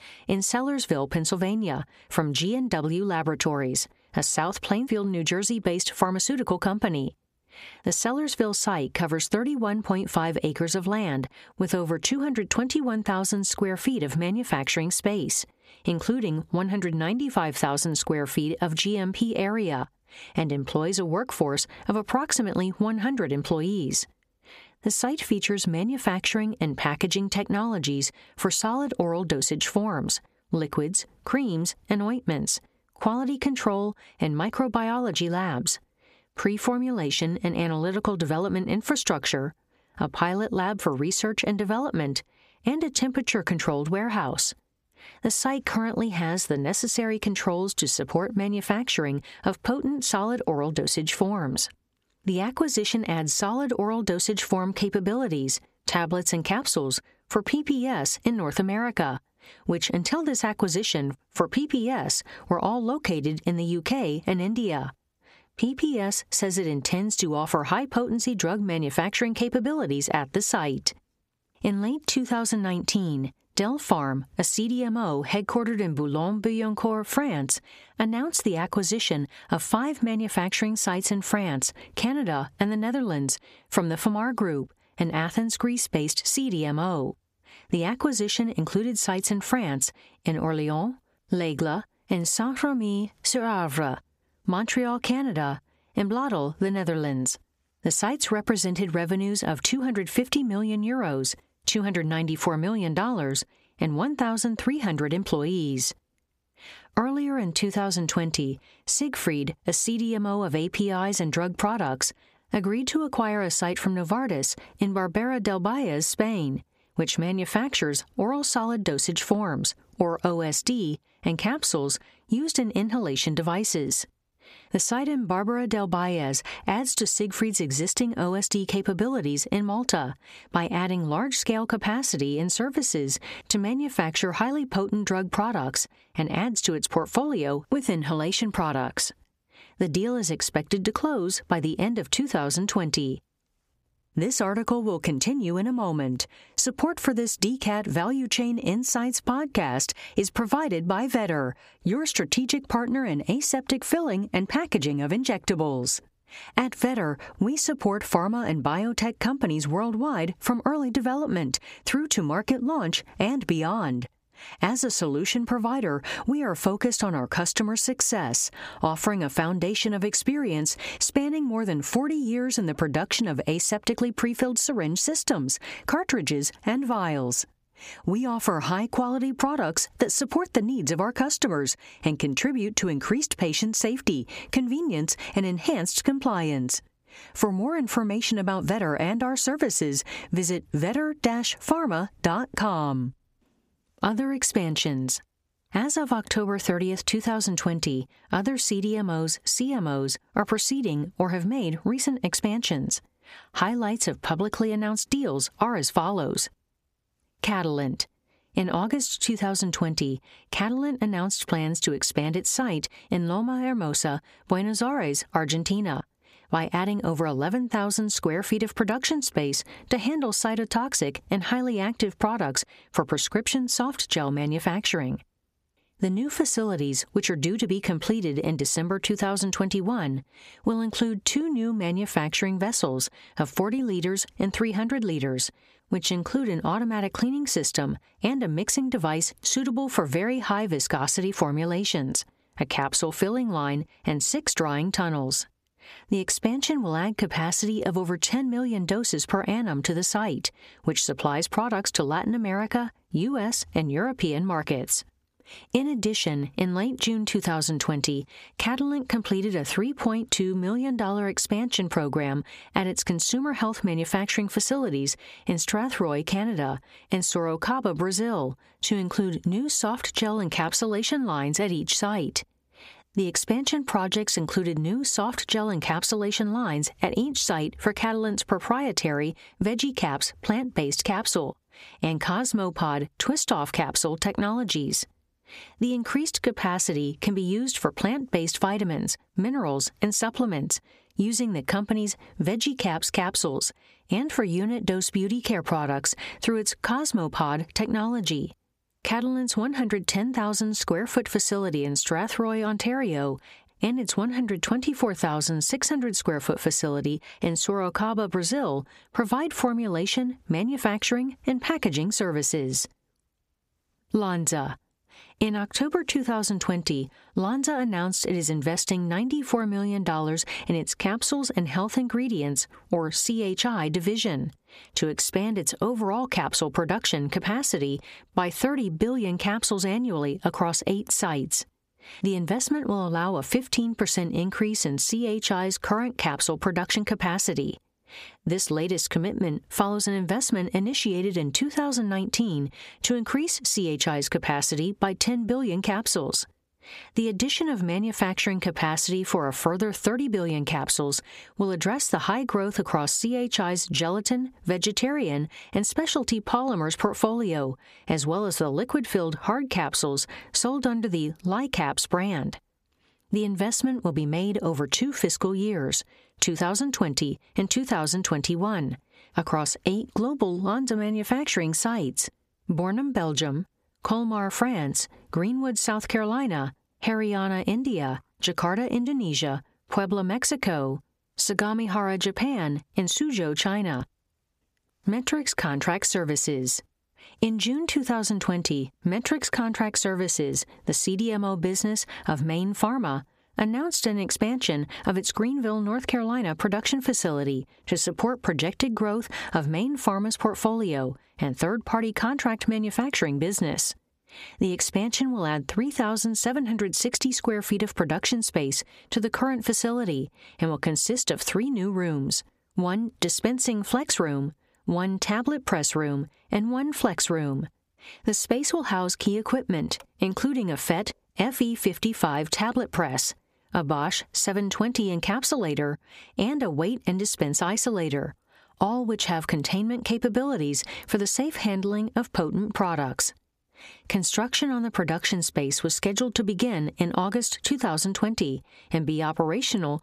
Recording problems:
squashed, flat; heavily

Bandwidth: 15 kHz